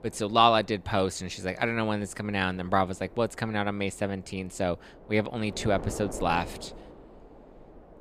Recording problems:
wind noise on the microphone; occasional gusts; 20 dB below the speech

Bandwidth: 15 kHz